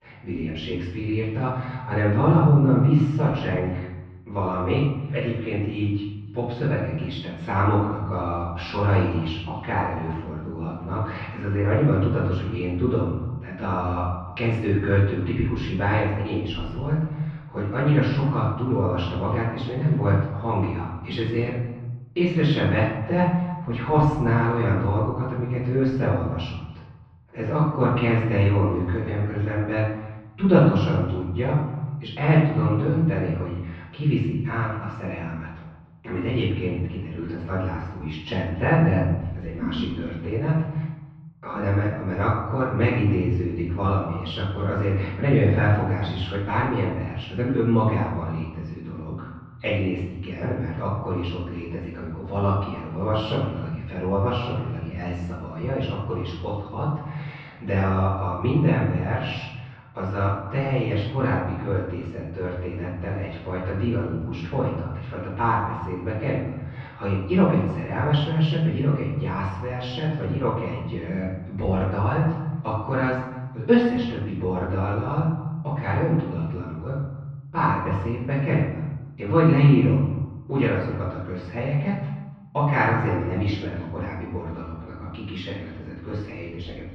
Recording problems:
off-mic speech; far
muffled; very; fading above 3 kHz
room echo; noticeable; dies away in 0.9 s
echo of what is said; faint; throughout; 280 ms later, 25 dB below the speech

